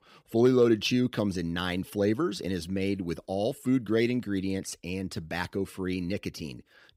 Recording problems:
none

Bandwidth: 15.5 kHz